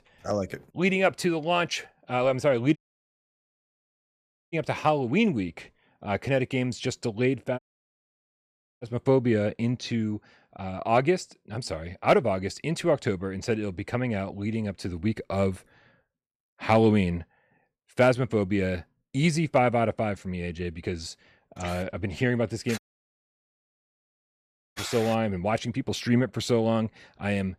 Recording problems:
audio cutting out; at 3 s for 2 s, at 7.5 s for 1 s and at 23 s for 2 s

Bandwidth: 14.5 kHz